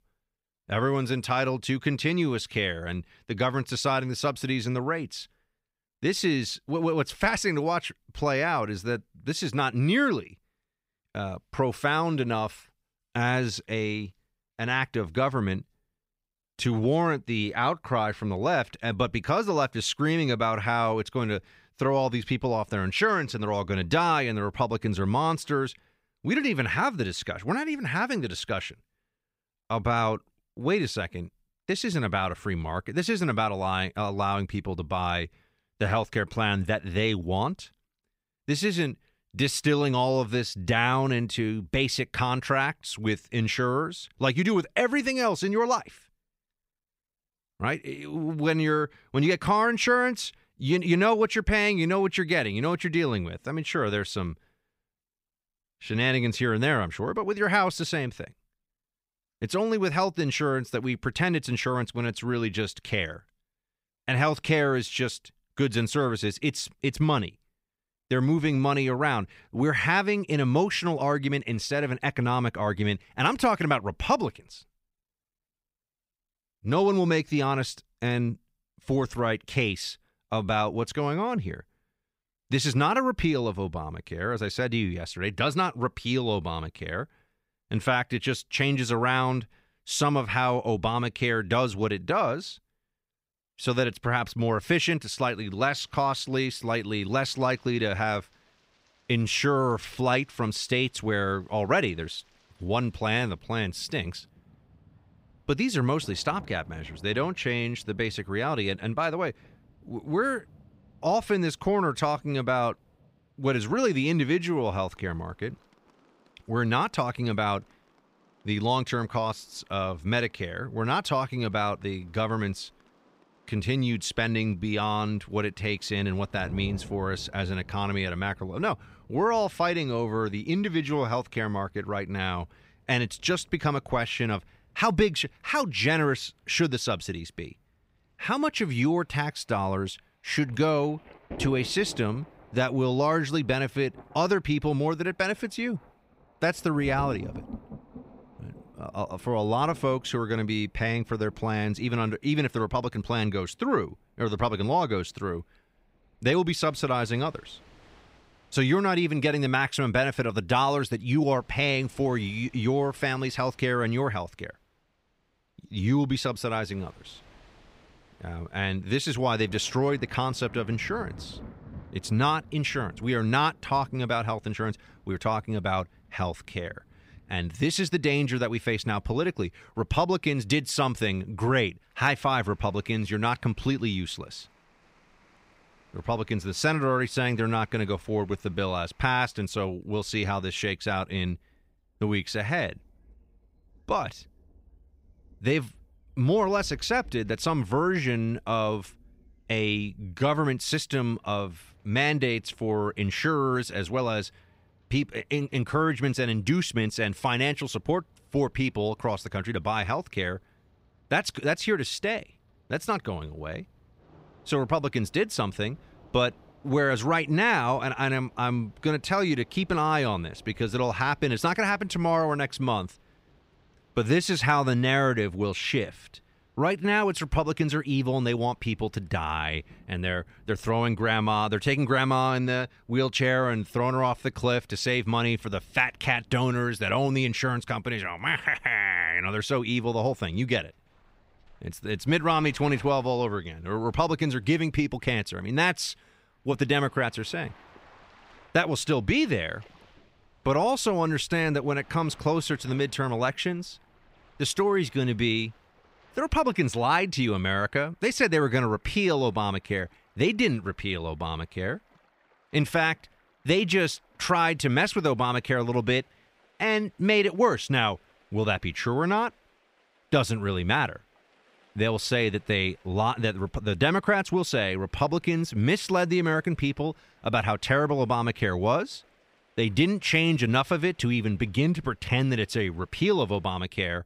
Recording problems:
rain or running water; faint; from 1:35 on; 25 dB below the speech

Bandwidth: 15.5 kHz